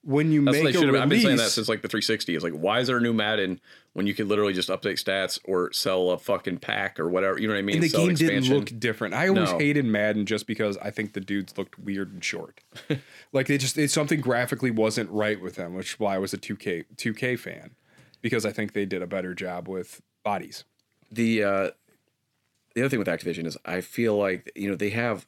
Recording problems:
uneven, jittery; strongly; from 2 to 24 s

